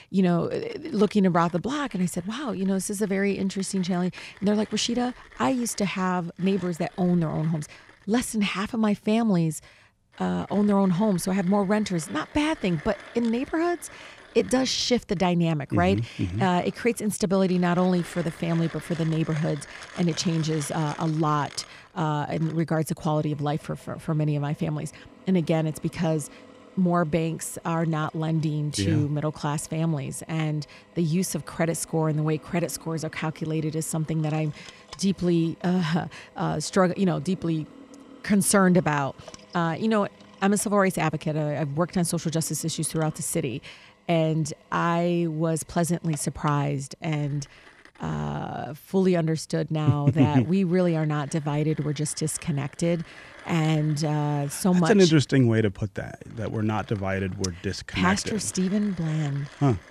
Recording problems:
machinery noise; faint; throughout; 20 dB below the speech

